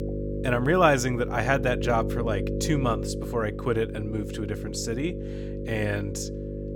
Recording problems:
electrical hum; loud; throughout; 50 Hz, 10 dB below the speech

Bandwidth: 17 kHz